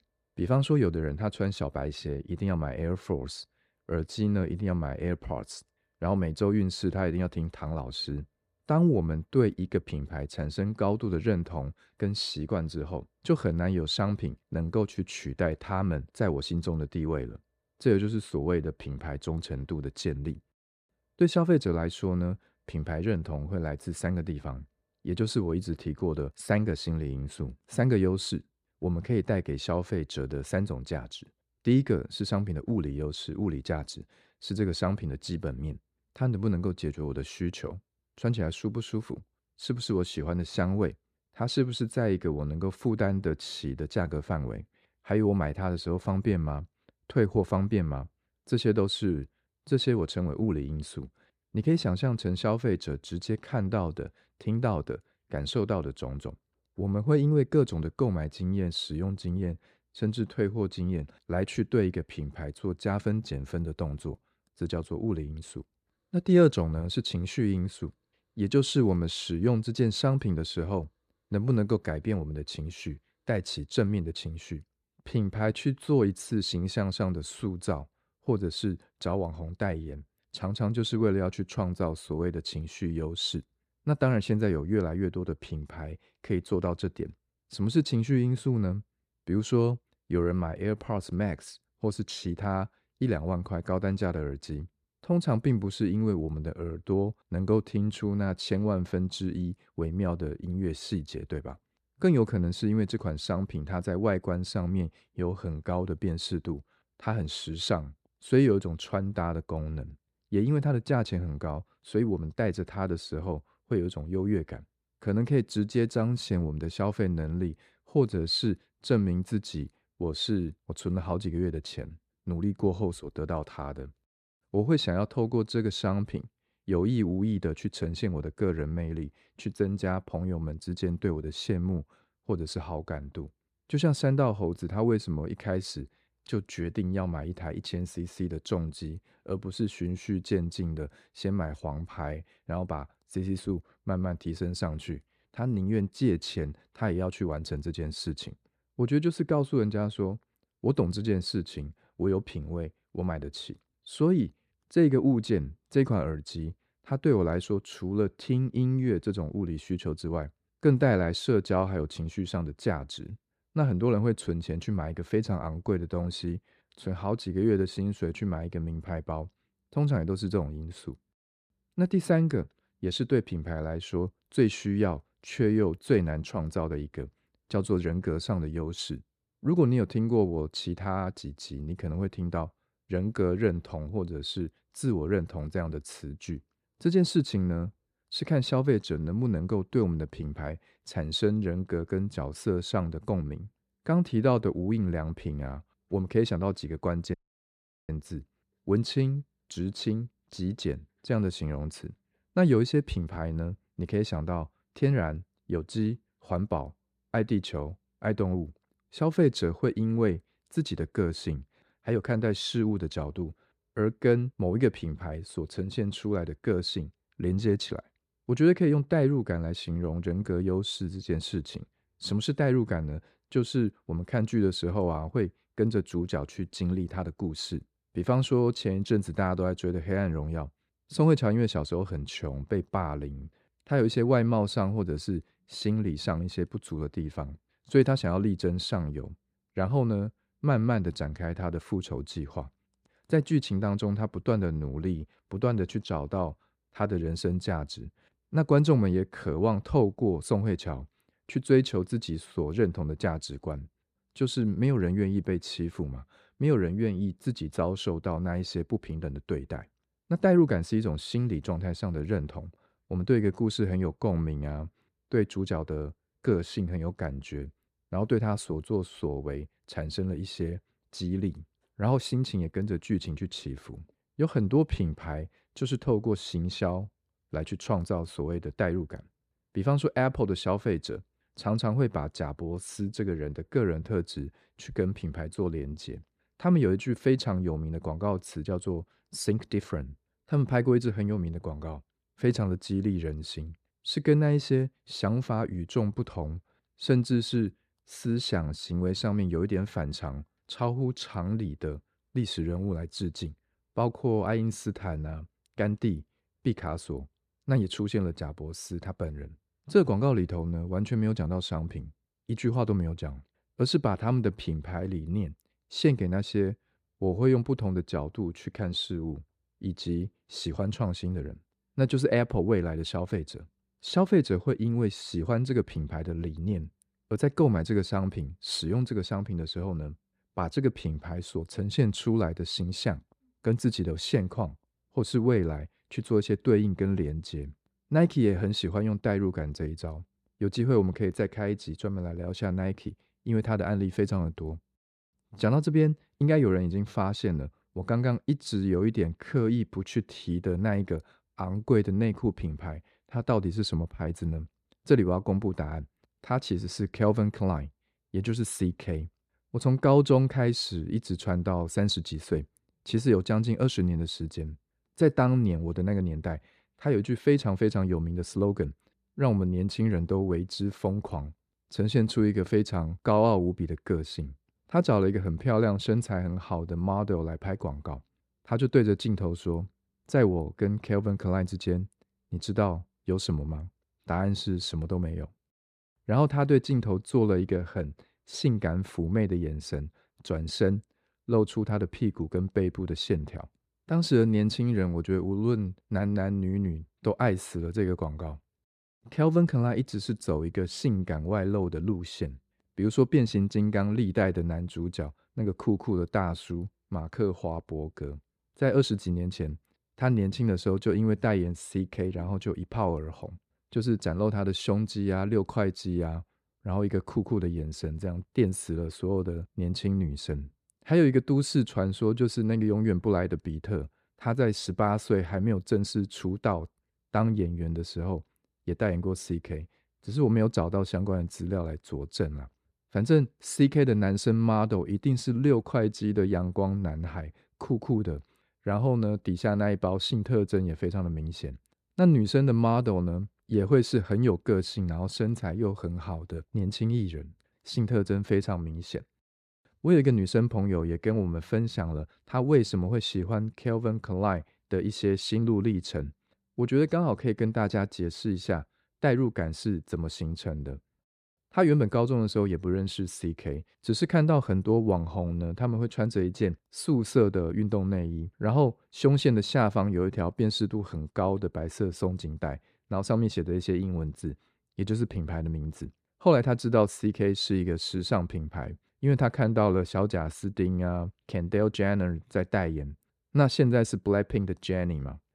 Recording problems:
audio cutting out; at 3:17 for 1 s

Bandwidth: 14.5 kHz